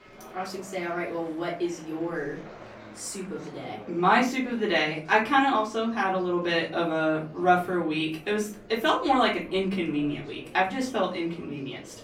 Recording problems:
off-mic speech; far
room echo; slight; dies away in 0.3 s
murmuring crowd; faint; throughout; 20 dB below the speech

